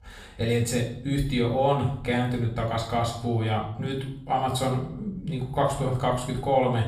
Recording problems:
off-mic speech; far
room echo; slight; dies away in 0.5 s

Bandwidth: 14.5 kHz